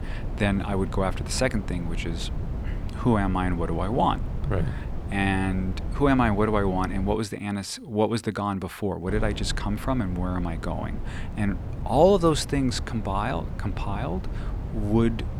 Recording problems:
wind noise on the microphone; occasional gusts; until 7 s and from 9 s on; 15 dB below the speech

